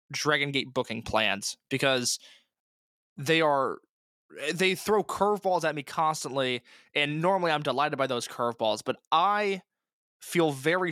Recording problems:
abrupt cut into speech; at the end

